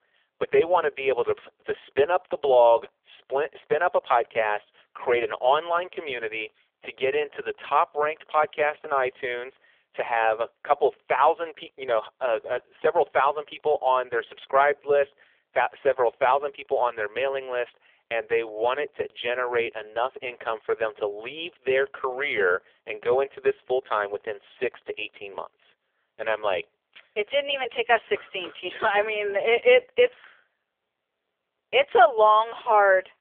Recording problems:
phone-call audio; poor line; nothing above 3.5 kHz

